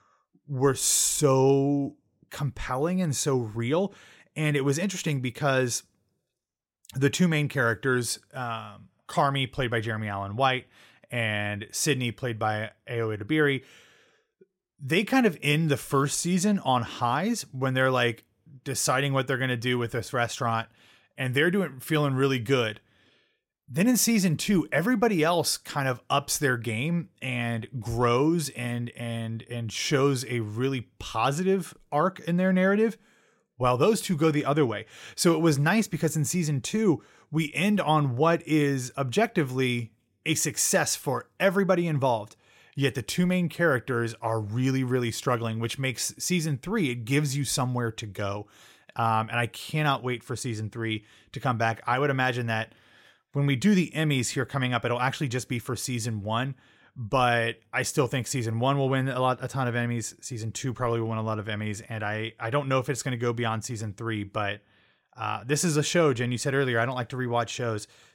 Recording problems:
none

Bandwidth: 16.5 kHz